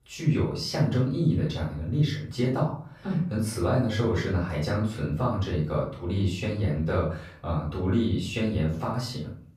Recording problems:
off-mic speech; far
room echo; noticeable; dies away in 0.4 s

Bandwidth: 15 kHz